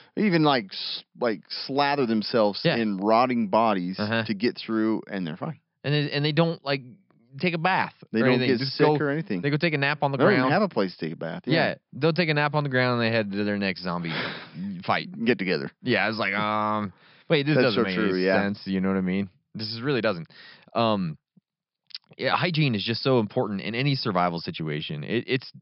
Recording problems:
high frequencies cut off; noticeable; nothing above 5.5 kHz

